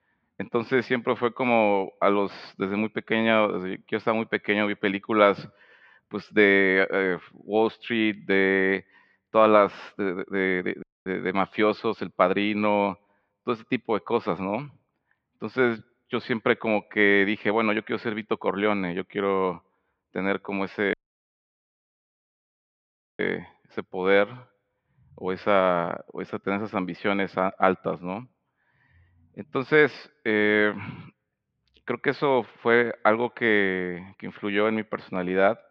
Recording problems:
muffled; very; fading above 3 kHz
audio cutting out; at 11 s and at 21 s for 2.5 s

